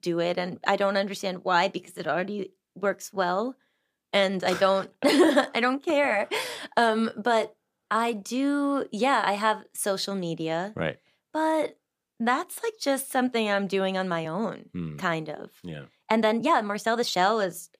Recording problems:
uneven, jittery; strongly; from 2 to 17 s

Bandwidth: 15 kHz